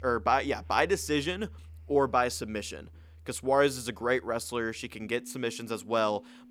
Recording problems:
background music; faint; throughout; 20 dB below the speech

